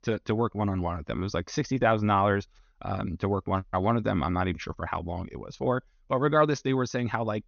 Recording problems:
high frequencies cut off; noticeable; nothing above 6.5 kHz

